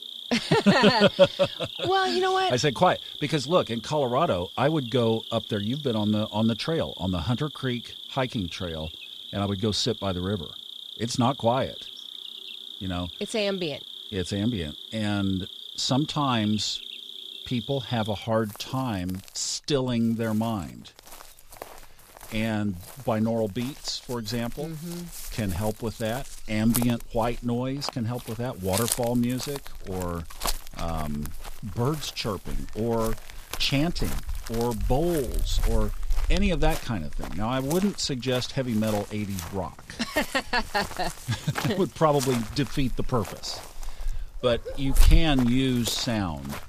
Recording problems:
animal sounds; loud; throughout; 9 dB below the speech

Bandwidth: 14.5 kHz